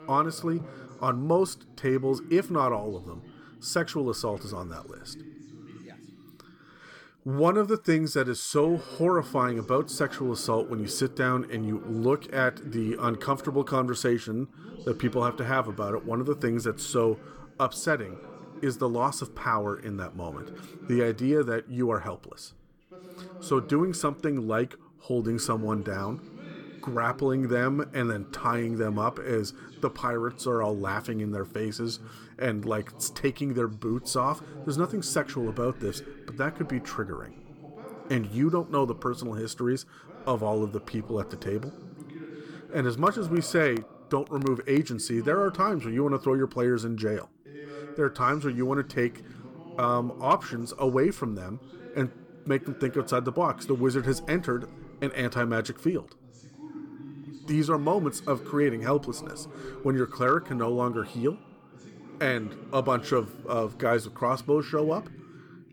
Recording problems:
voice in the background; noticeable; throughout; 15 dB below the speech

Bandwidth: 18 kHz